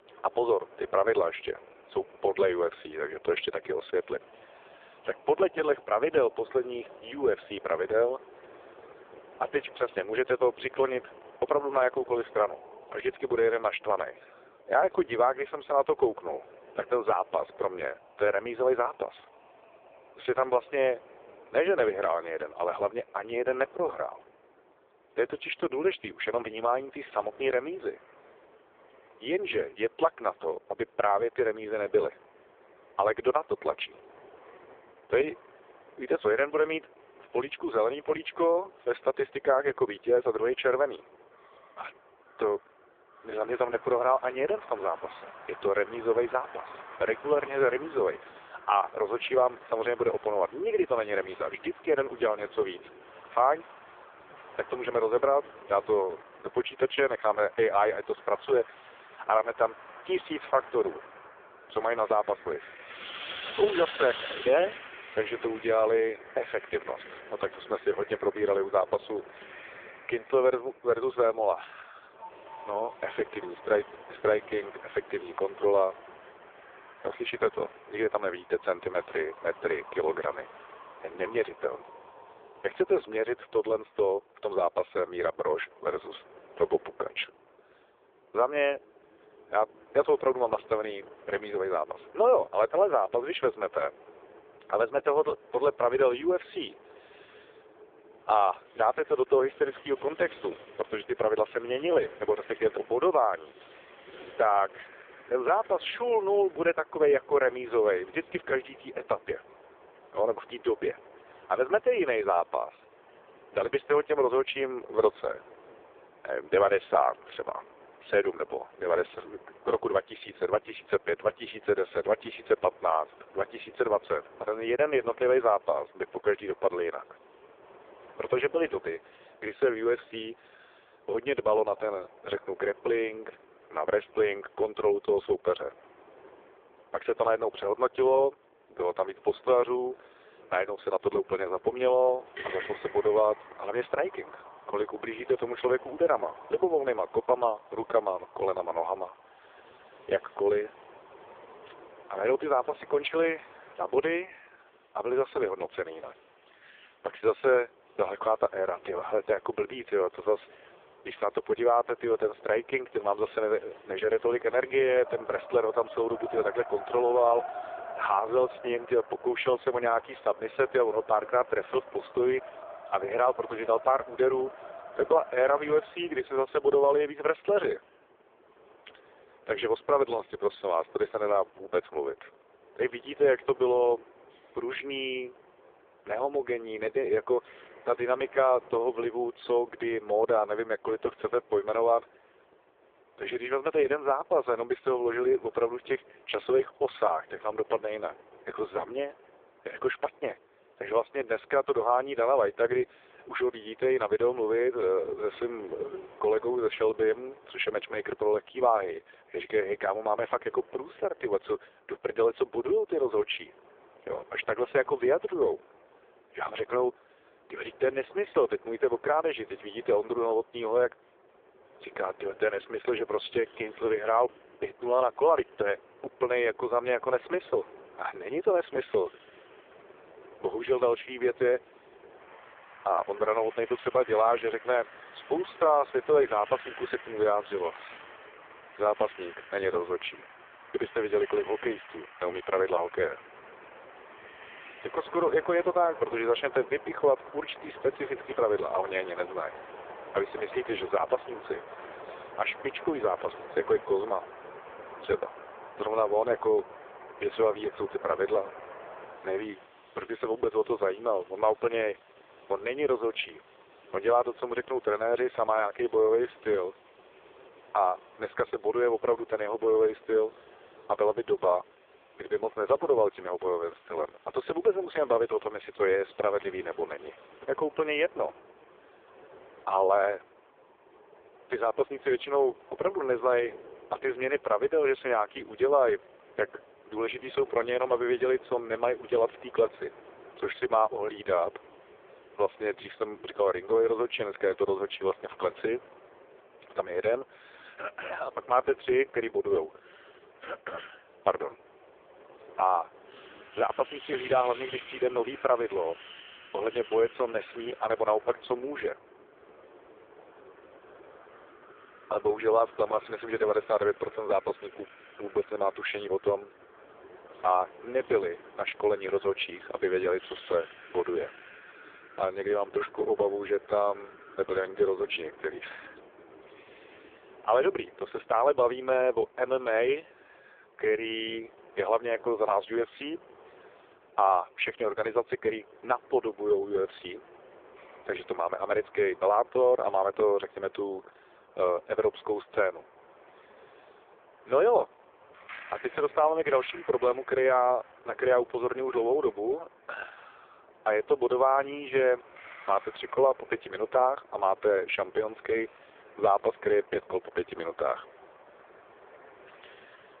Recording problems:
phone-call audio; poor line
wind in the background; faint; throughout; 20 dB below the speech

